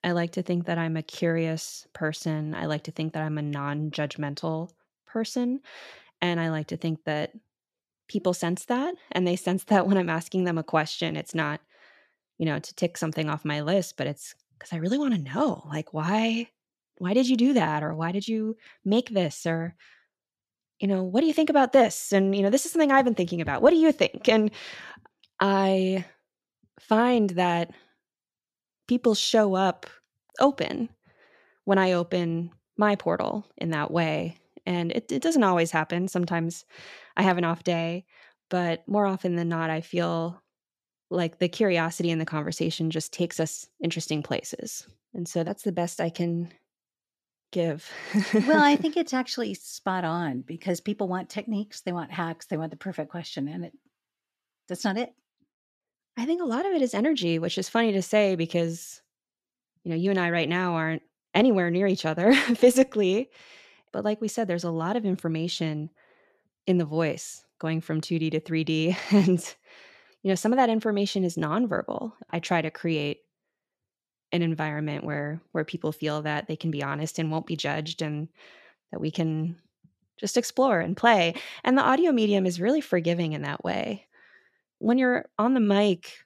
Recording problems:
none

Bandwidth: 14 kHz